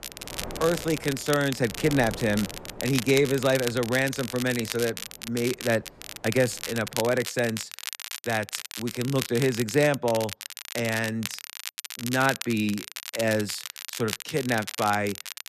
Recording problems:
crackle, like an old record; loud; 8 dB below the speech
wind noise on the microphone; occasional gusts; until 7 s; 20 dB below the speech

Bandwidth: 14 kHz